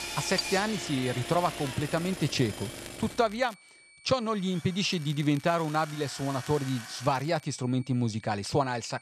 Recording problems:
machinery noise; loud; until 7 s; 8 dB below the speech
high-pitched whine; faint; throughout; 2.5 kHz, 25 dB below the speech
crackling; faint; from 1 to 3.5 s and from 5 to 7.5 s; 20 dB below the speech

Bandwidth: 13.5 kHz